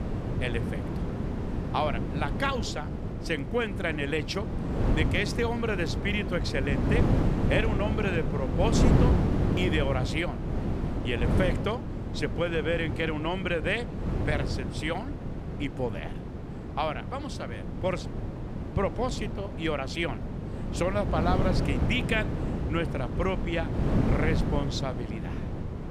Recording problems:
wind noise on the microphone; heavy; 6 dB below the speech

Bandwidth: 14.5 kHz